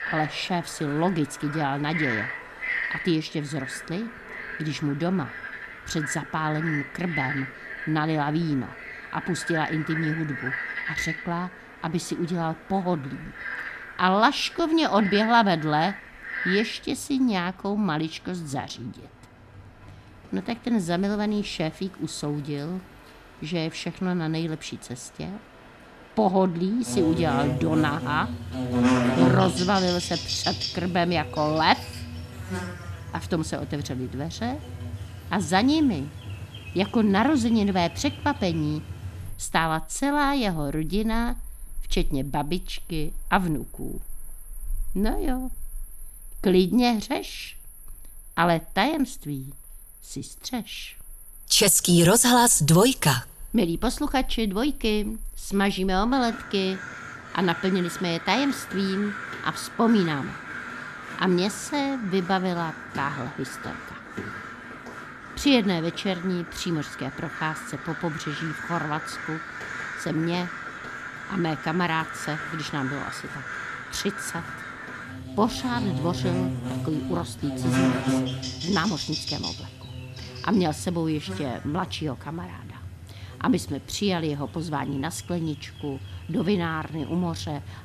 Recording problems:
animal sounds; loud; throughout; 8 dB below the speech

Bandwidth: 13.5 kHz